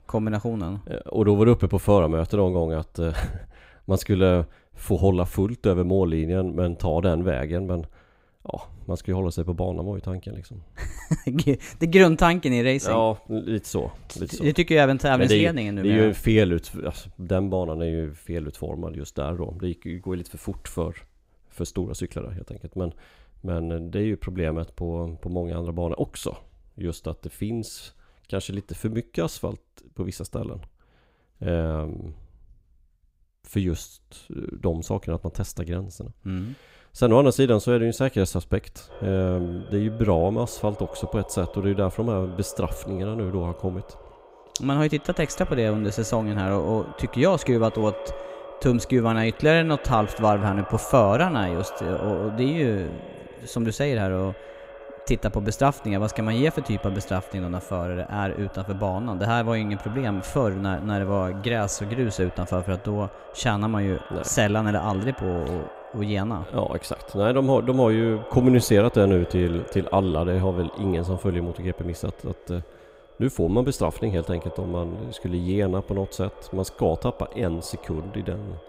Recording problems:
echo of what is said; noticeable; from 39 s on; 130 ms later, 15 dB below the speech

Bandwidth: 15.5 kHz